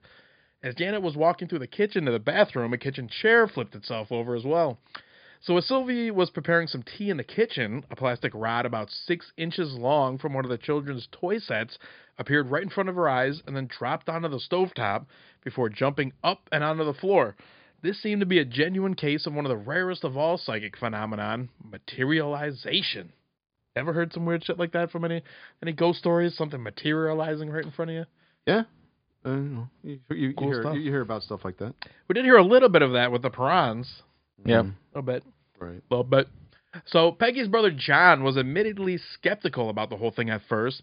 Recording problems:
high frequencies cut off; severe; nothing above 5 kHz

